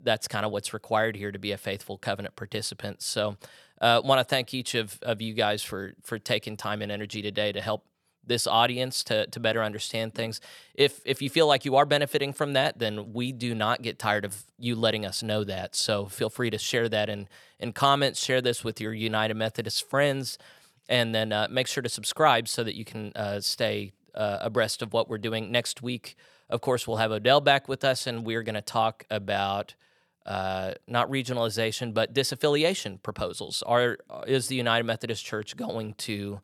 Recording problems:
none

